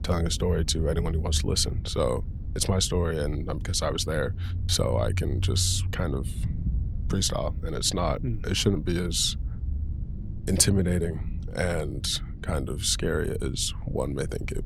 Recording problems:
low rumble; noticeable; throughout; 20 dB below the speech

